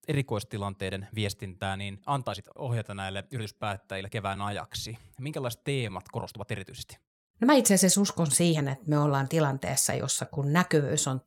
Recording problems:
uneven, jittery; strongly; from 1 to 11 s

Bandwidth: 17.5 kHz